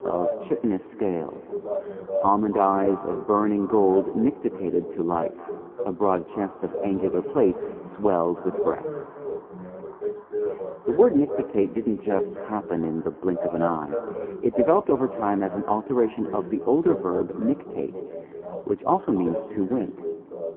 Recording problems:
phone-call audio; poor line
muffled; very; fading above 2 kHz
echo of what is said; noticeable; throughout; 280 ms later, 15 dB below the speech
voice in the background; loud; throughout; 8 dB below the speech
traffic noise; faint; throughout; 25 dB below the speech

